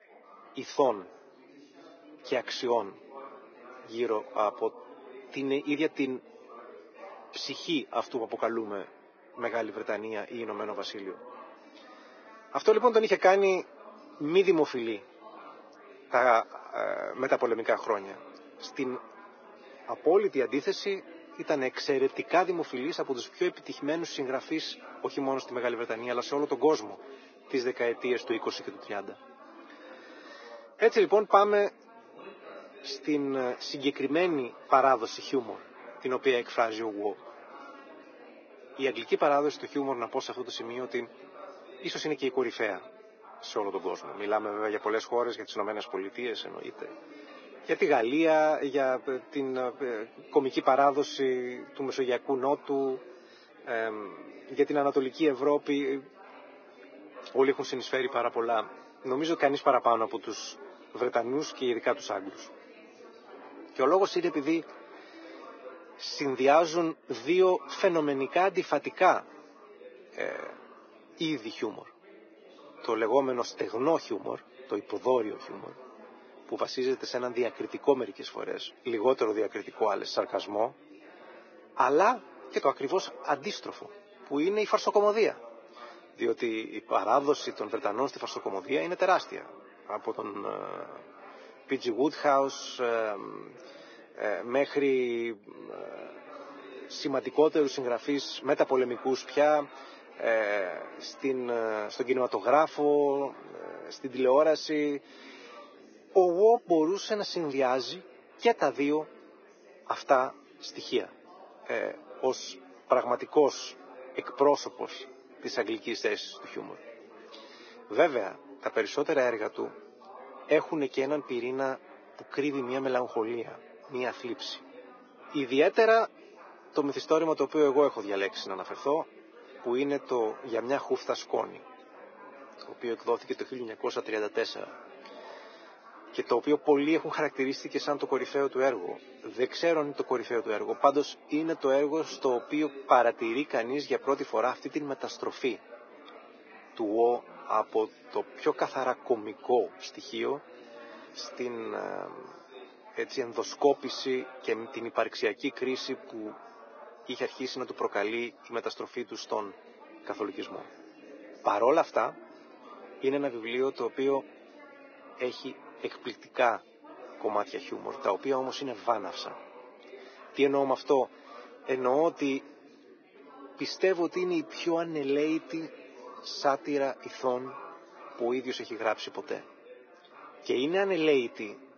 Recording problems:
garbled, watery; badly; nothing above 6.5 kHz
thin; somewhat; fading below 300 Hz
muffled; very slightly; fading above 2.5 kHz
chatter from many people; faint; throughout; 20 dB below the speech

